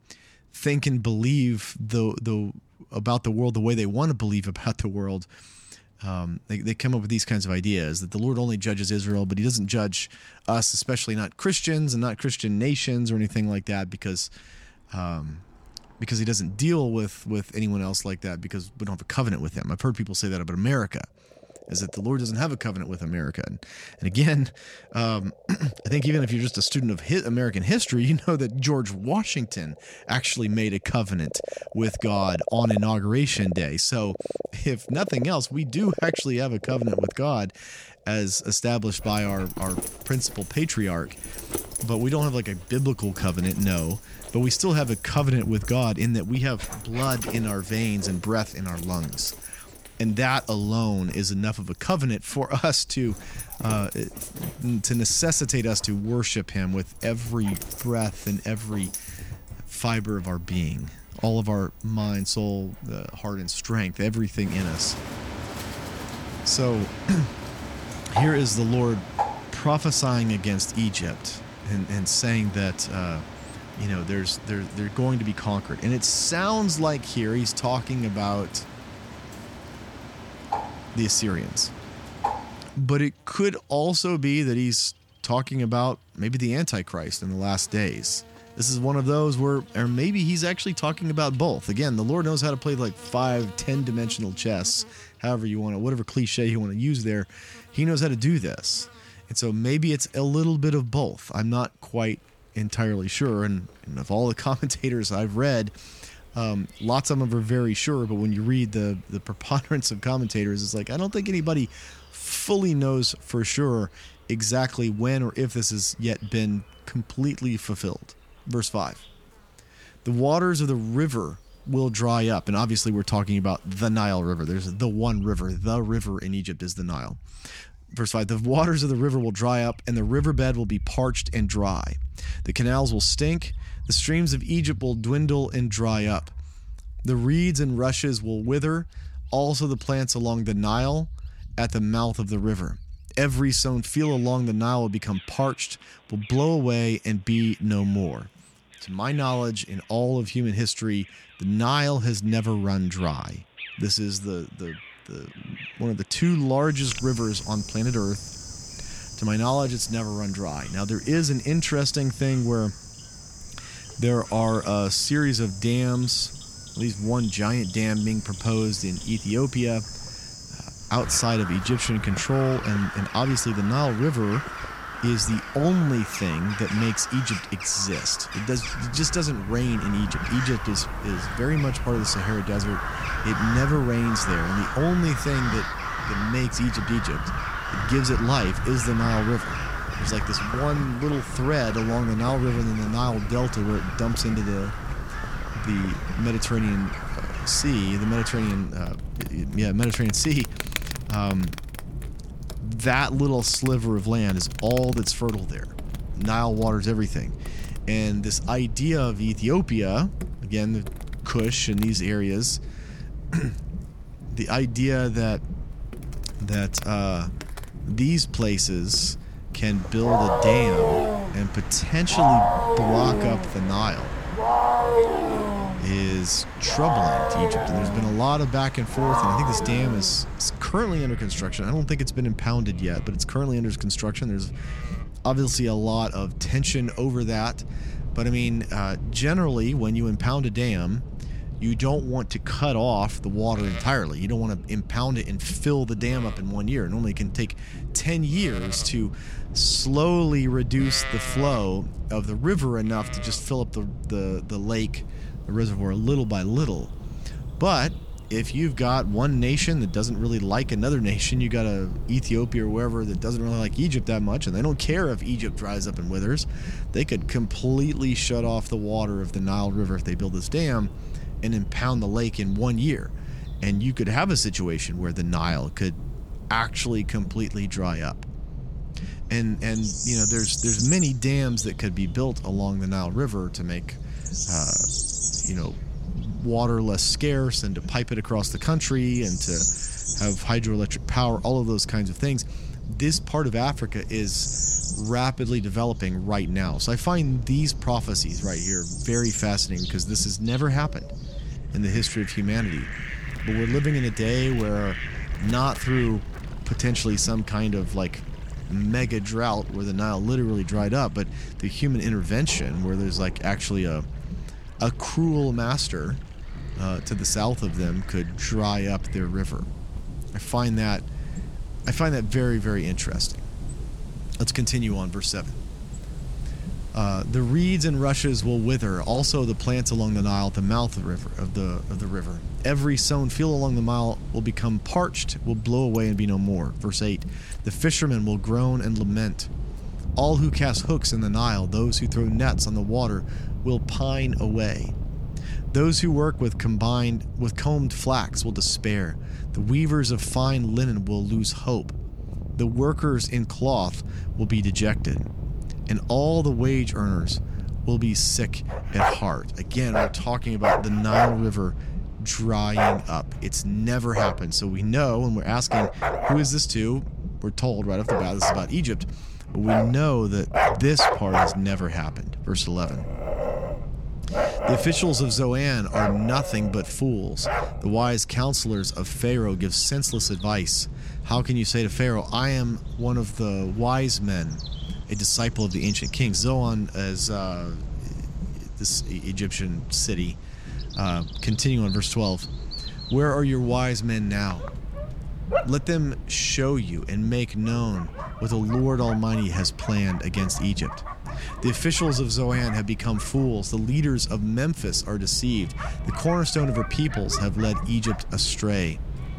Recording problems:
animal sounds; loud; throughout; 6 dB below the speech
low rumble; noticeable; from 2:59 on; 20 dB below the speech

